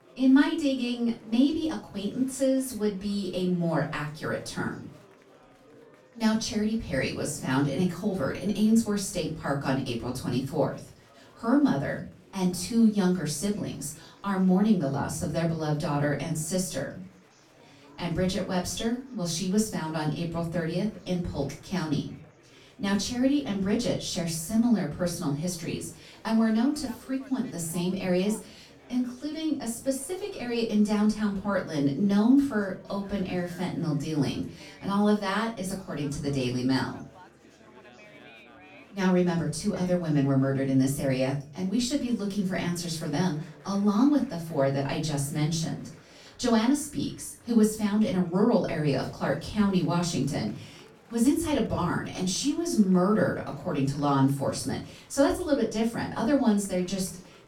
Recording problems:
off-mic speech; far
room echo; slight; dies away in 0.3 s
murmuring crowd; faint; throughout; 25 dB below the speech

